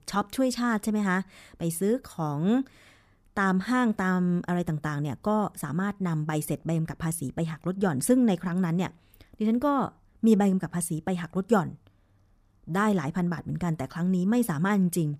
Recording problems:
none

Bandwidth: 15 kHz